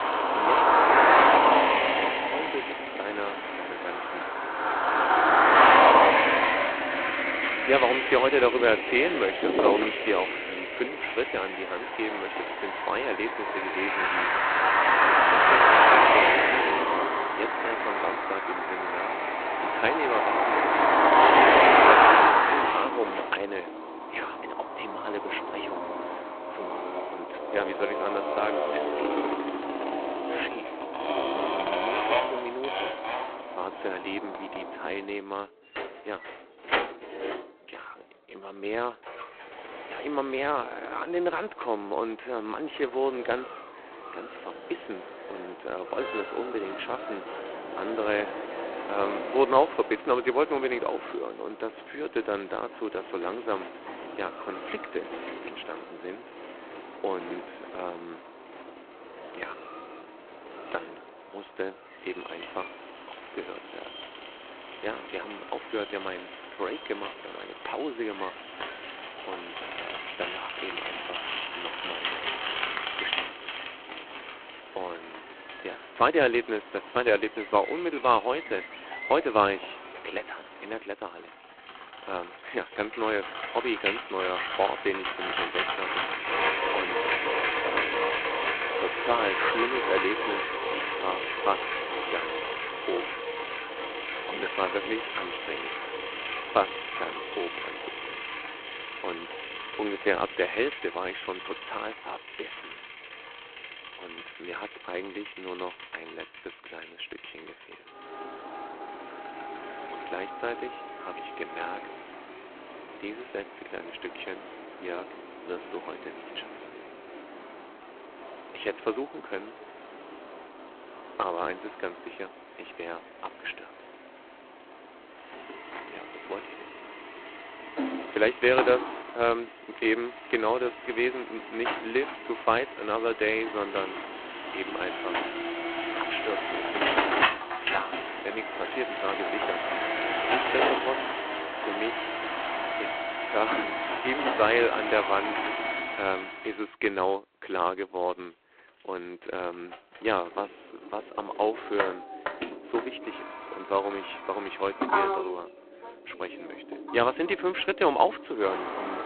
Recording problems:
phone-call audio; poor line; nothing above 4 kHz
traffic noise; very loud; throughout; 5 dB above the speech

